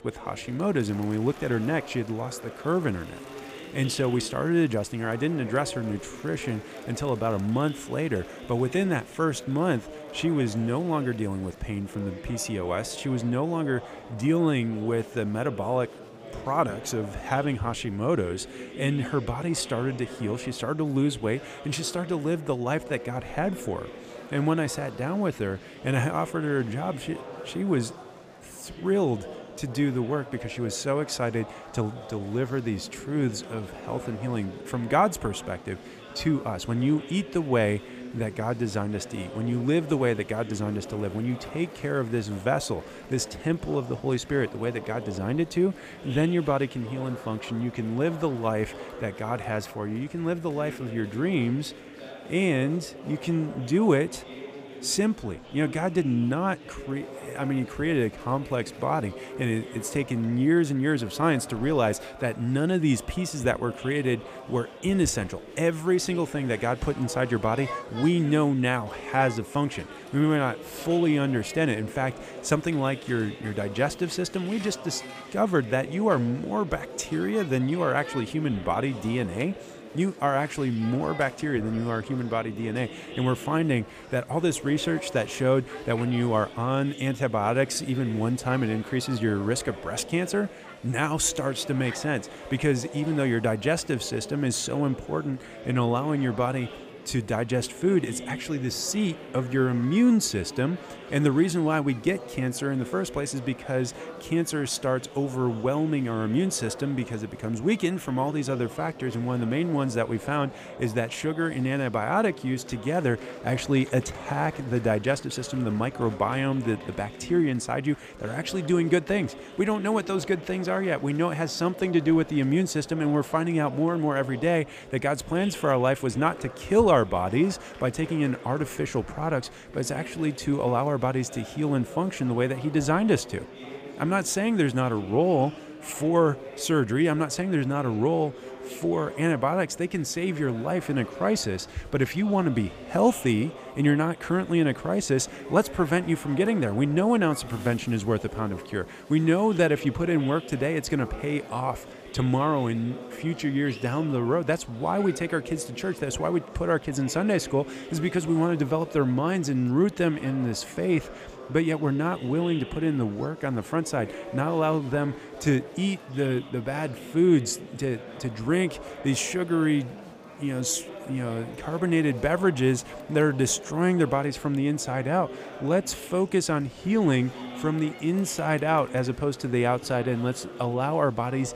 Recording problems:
murmuring crowd; noticeable; throughout; 15 dB below the speech

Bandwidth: 15 kHz